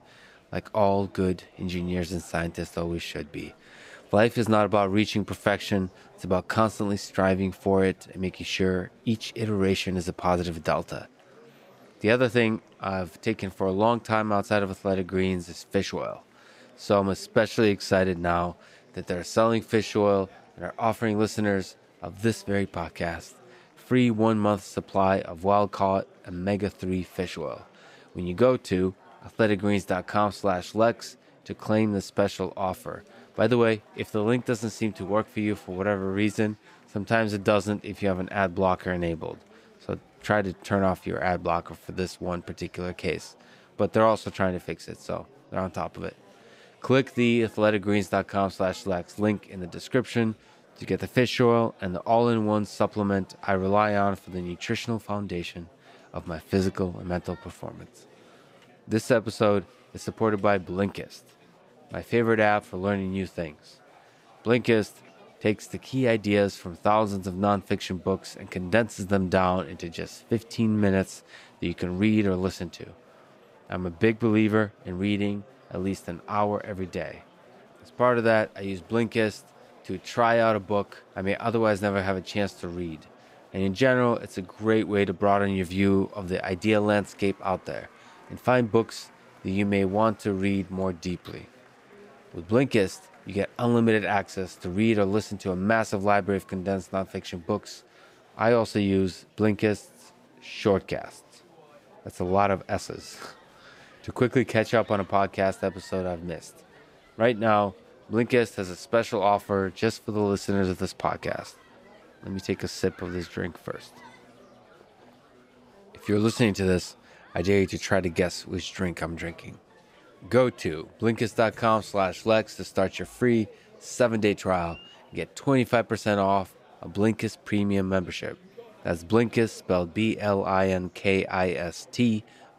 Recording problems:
murmuring crowd; faint; throughout; 25 dB below the speech

